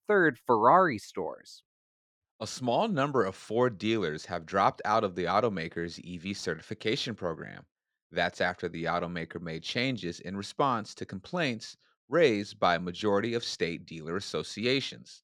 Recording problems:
muffled; slightly; fading above 3.5 kHz

